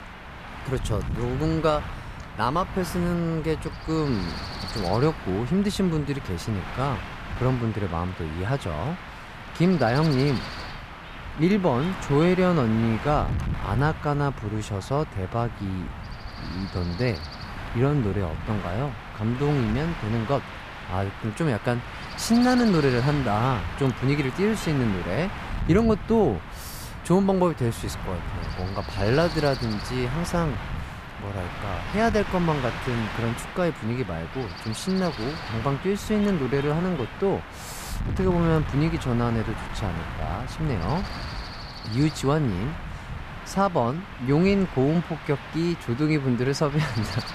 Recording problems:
wind noise on the microphone; heavy; 8 dB below the speech

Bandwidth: 14.5 kHz